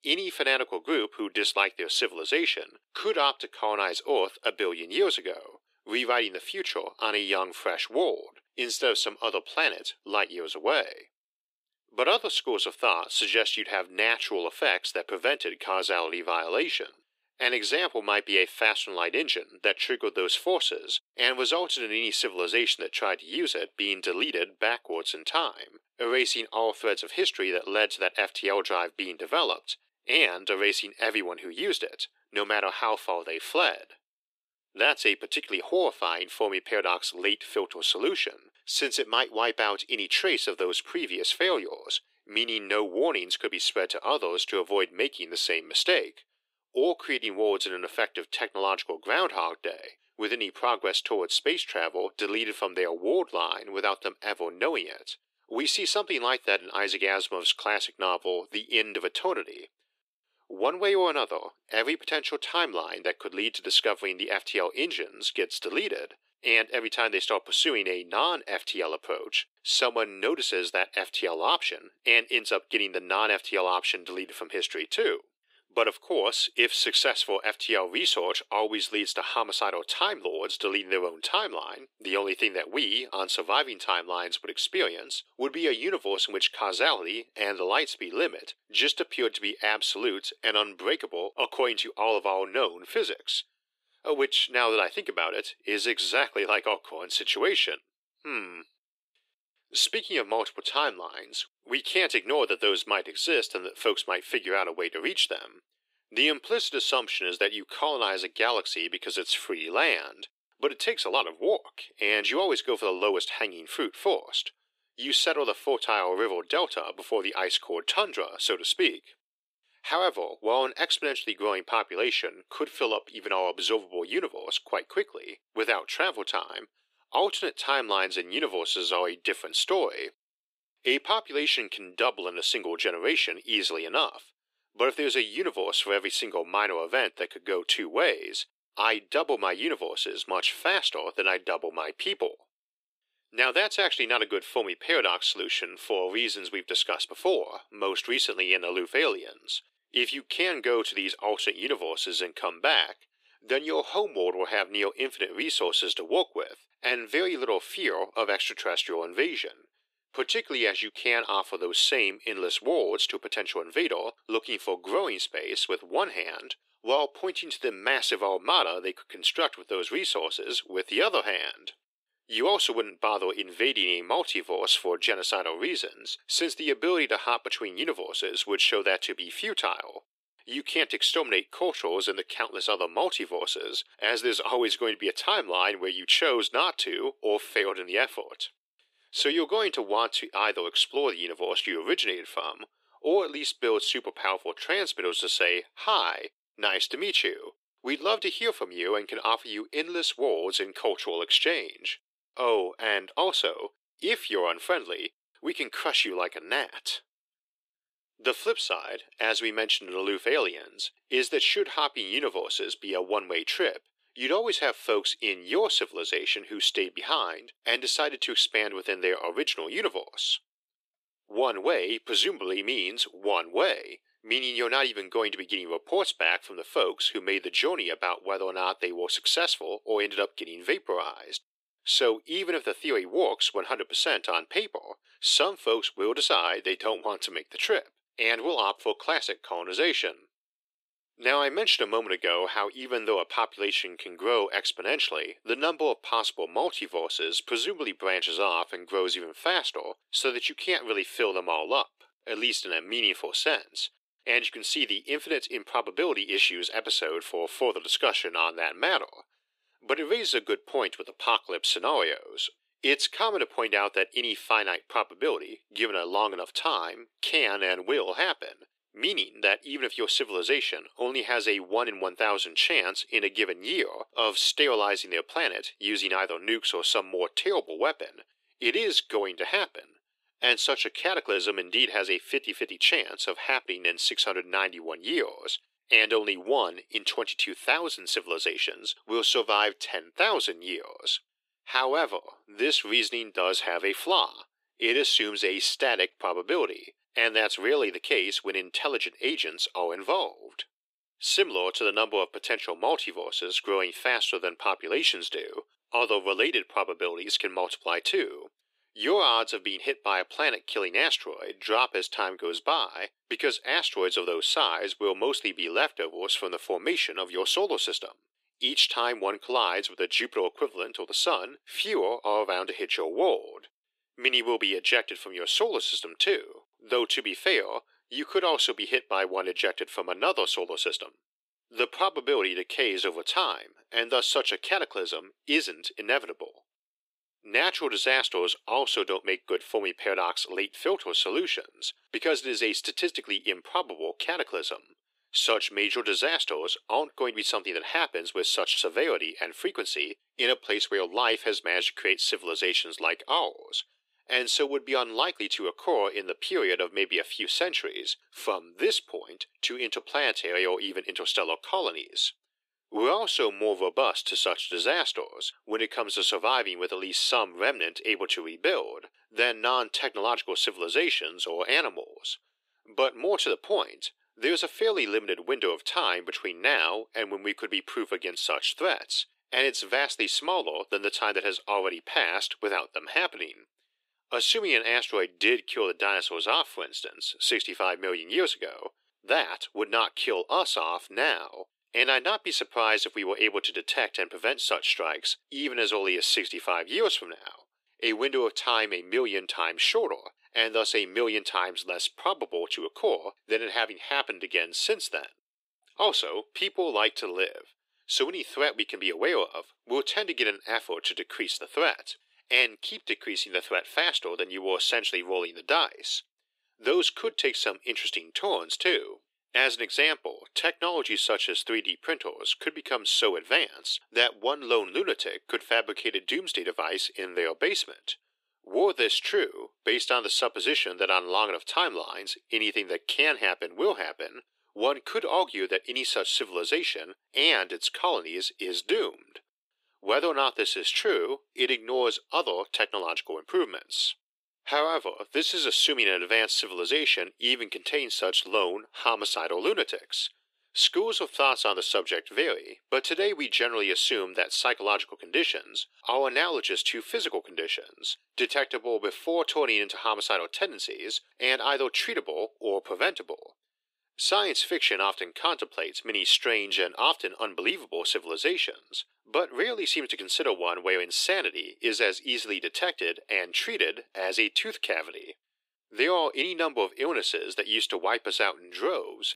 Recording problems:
thin; very; fading below 350 Hz

